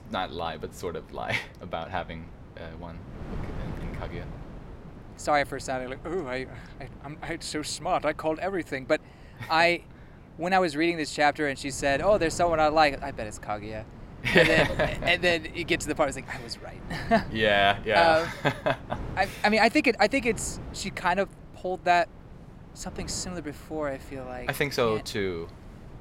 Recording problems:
wind noise on the microphone; occasional gusts; 25 dB below the speech

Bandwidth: 16 kHz